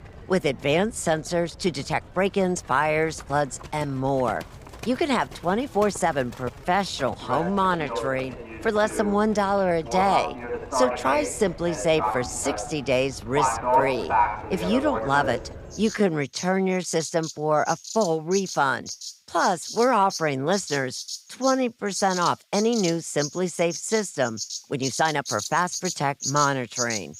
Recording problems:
animal sounds; loud; throughout; 6 dB below the speech
uneven, jittery; strongly; from 1.5 to 26 s

